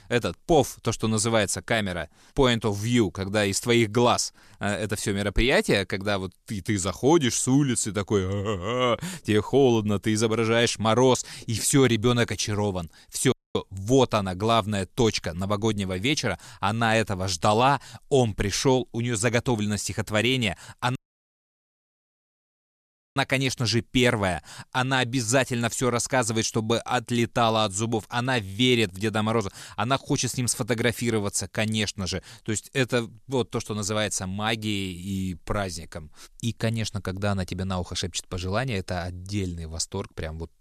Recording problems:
audio cutting out; at 13 s and at 21 s for 2 s

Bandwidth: 14 kHz